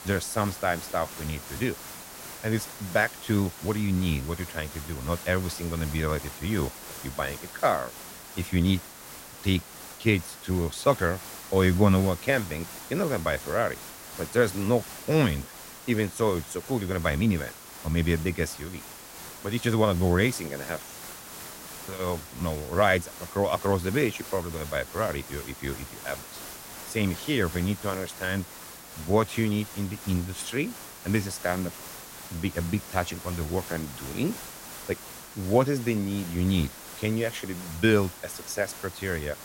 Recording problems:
hiss; noticeable; throughout; 10 dB below the speech

